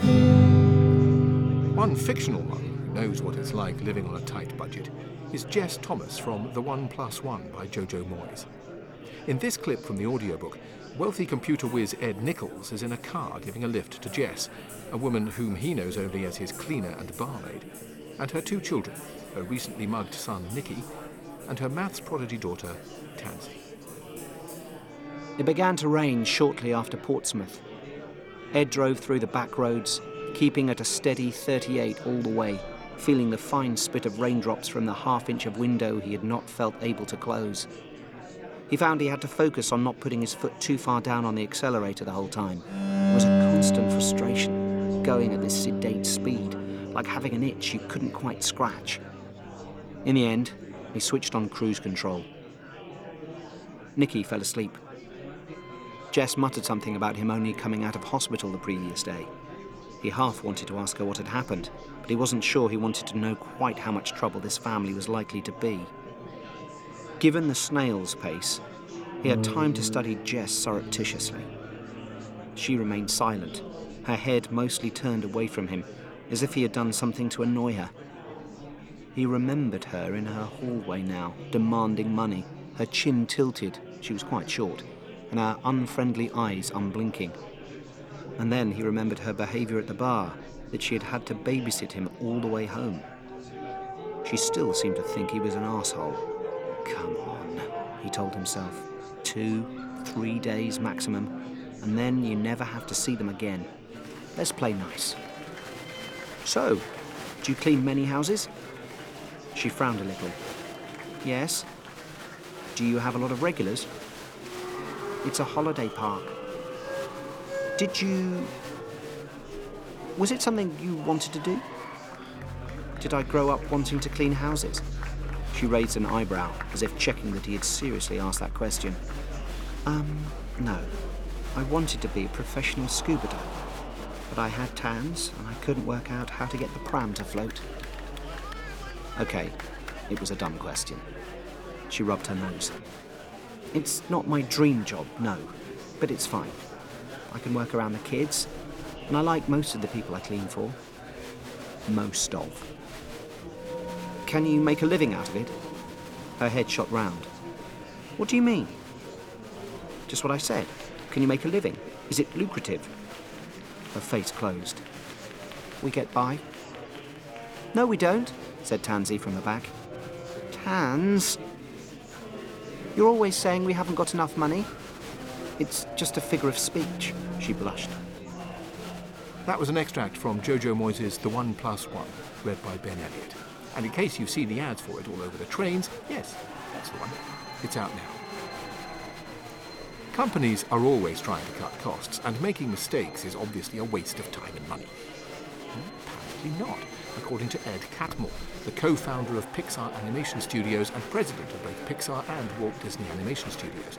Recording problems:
background music; loud; throughout; 4 dB below the speech
murmuring crowd; noticeable; throughout; 15 dB below the speech

